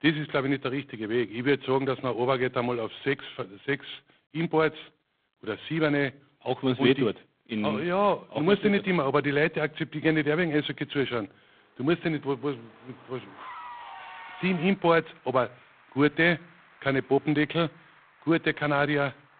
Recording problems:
phone-call audio; poor line; nothing above 3.5 kHz
traffic noise; faint; from 10 s on; 20 dB below the speech

